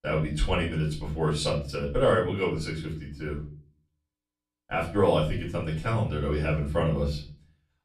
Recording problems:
off-mic speech; far
room echo; slight; dies away in 0.4 s

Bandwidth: 13.5 kHz